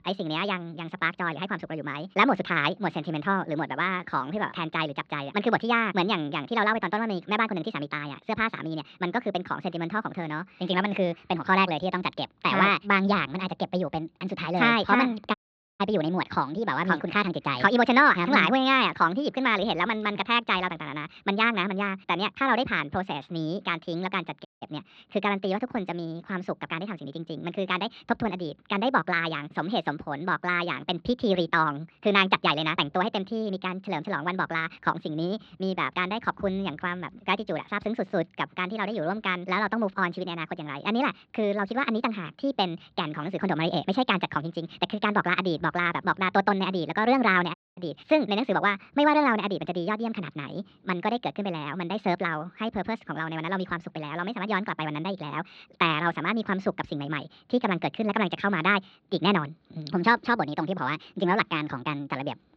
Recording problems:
wrong speed and pitch; too fast and too high; 1.5 times normal speed
muffled; very slightly; fading above 4 kHz
audio cutting out; at 15 s, at 24 s and at 48 s

